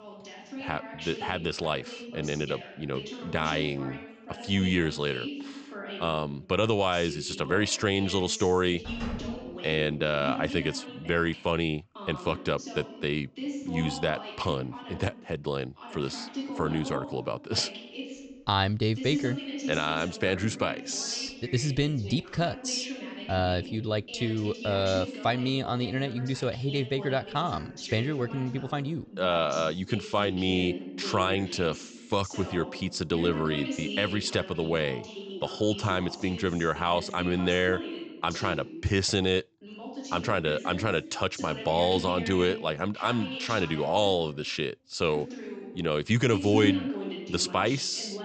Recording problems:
high frequencies cut off; noticeable; nothing above 8 kHz
voice in the background; loud; throughout; 10 dB below the speech
door banging; noticeable; at 9 s; peak 9 dB below the speech

